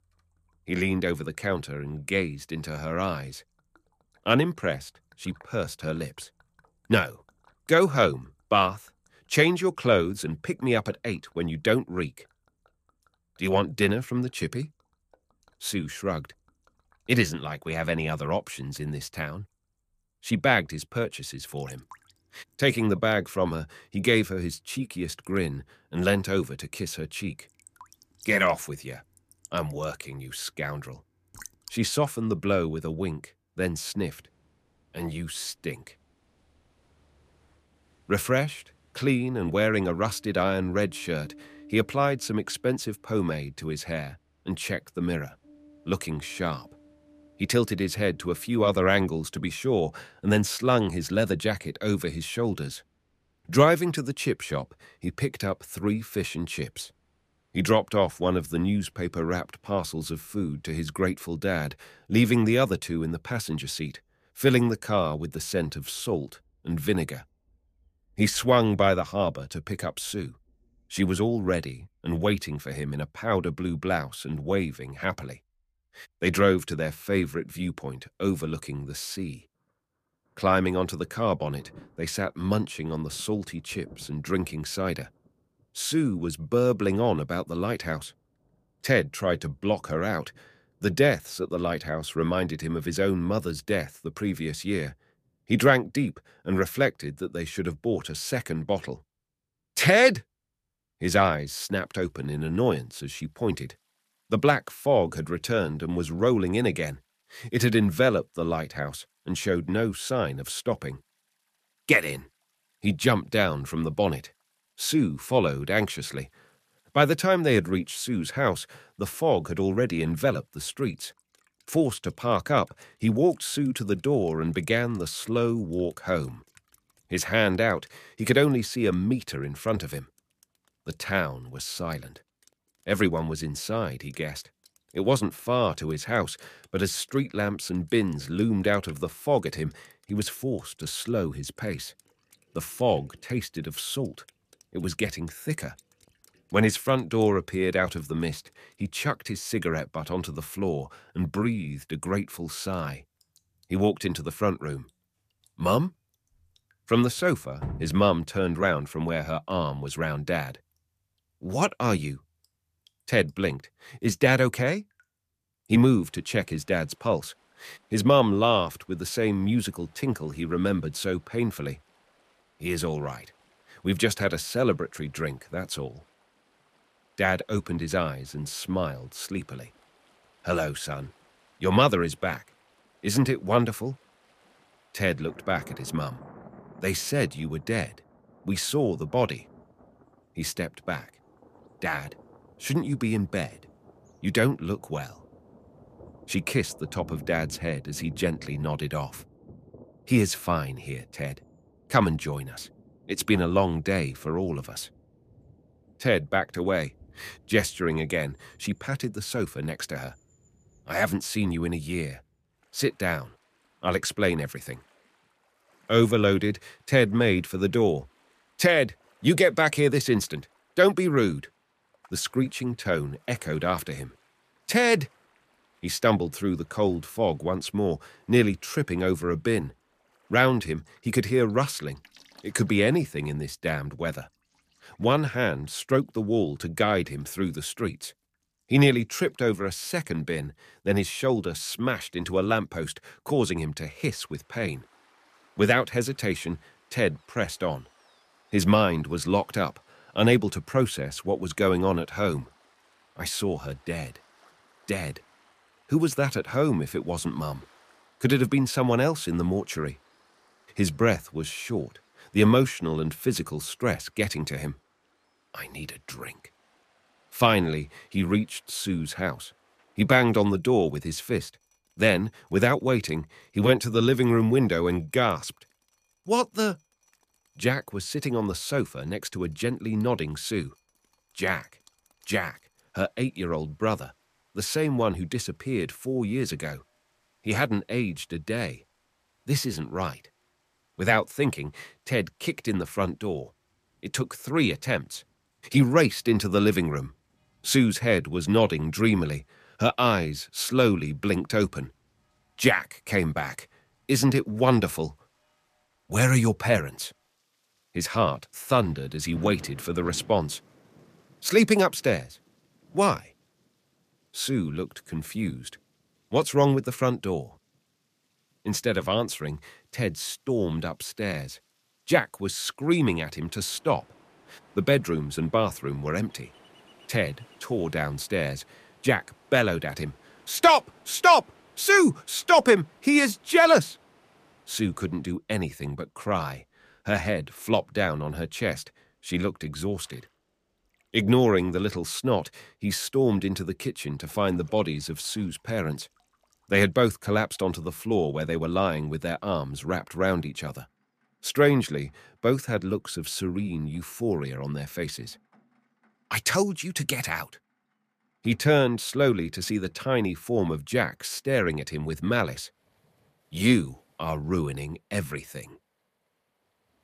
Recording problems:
rain or running water; faint; throughout; 30 dB below the speech

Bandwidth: 14.5 kHz